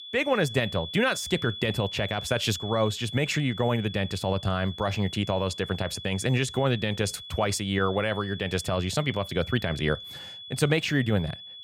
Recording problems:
high-pitched whine; noticeable; throughout; 3.5 kHz, 10 dB below the speech

